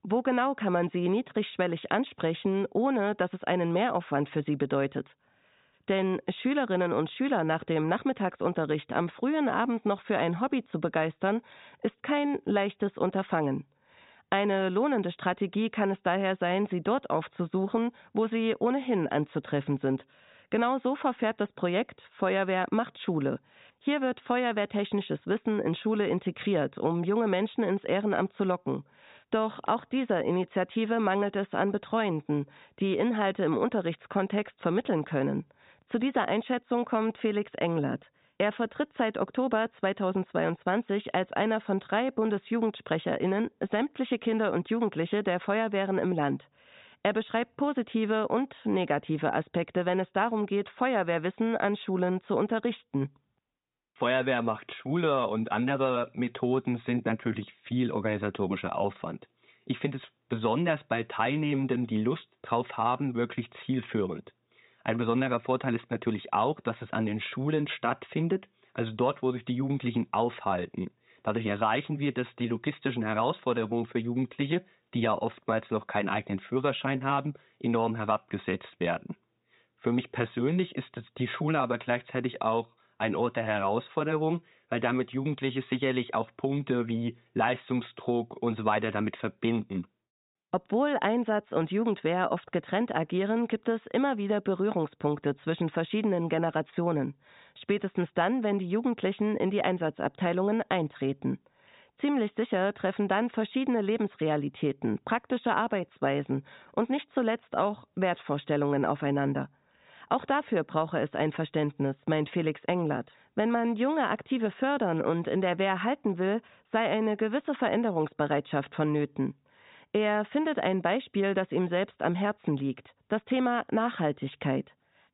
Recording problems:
high frequencies cut off; severe; nothing above 4 kHz

